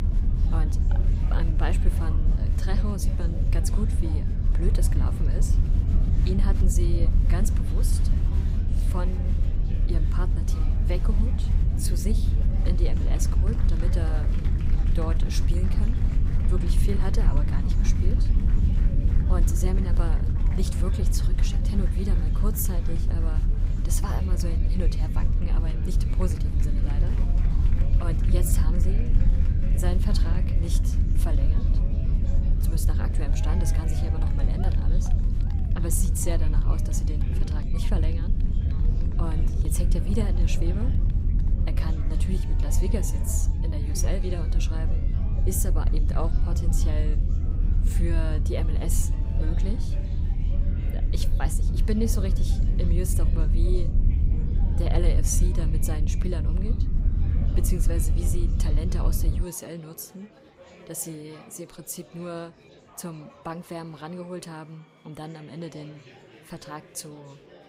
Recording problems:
low rumble; loud; until 59 s; 4 dB below the speech
murmuring crowd; noticeable; throughout; 10 dB below the speech

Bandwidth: 15.5 kHz